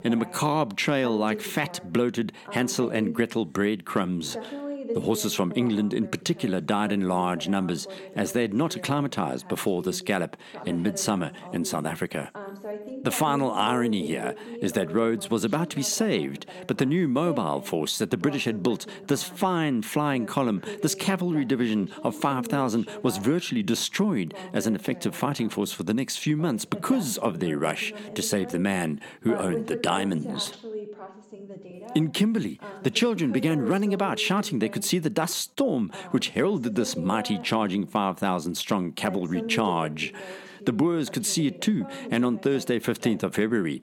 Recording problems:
voice in the background; noticeable; throughout; 15 dB below the speech

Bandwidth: 17 kHz